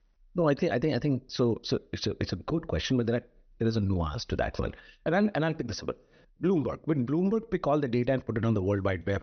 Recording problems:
high frequencies cut off; noticeable; nothing above 6 kHz

